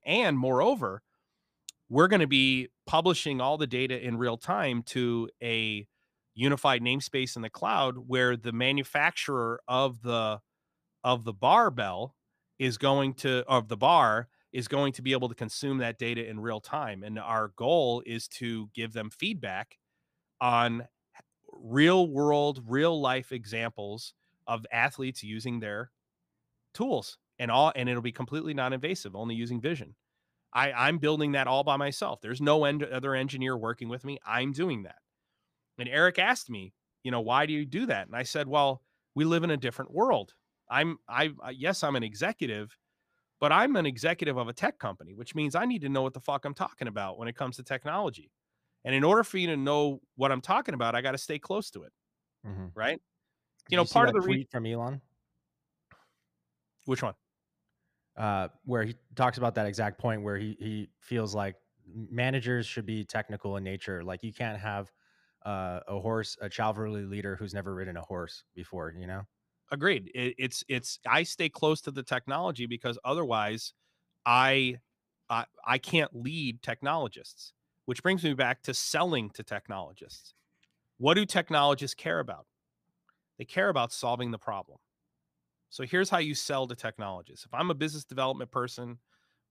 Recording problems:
none

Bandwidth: 15 kHz